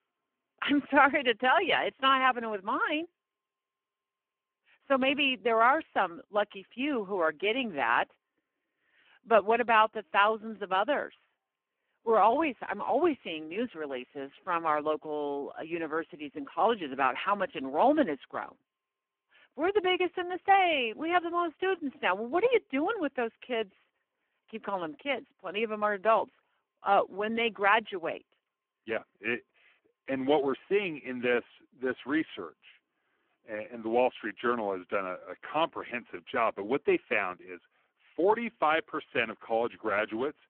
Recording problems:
phone-call audio; poor line

